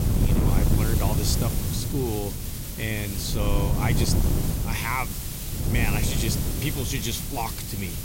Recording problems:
wind noise on the microphone; heavy; 6 dB below the speech
hiss; loud; throughout; 4 dB below the speech

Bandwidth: 16 kHz